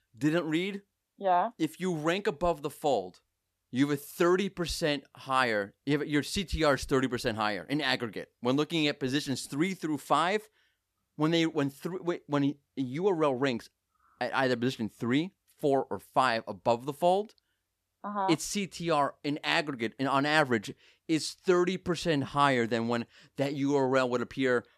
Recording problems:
none

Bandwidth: 14.5 kHz